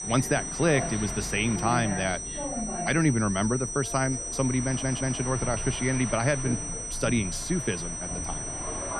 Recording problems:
high-pitched whine; loud; throughout; 6 kHz, 5 dB below the speech
train or aircraft noise; noticeable; throughout; 10 dB below the speech
audio stuttering; at 4.5 s

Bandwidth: 14 kHz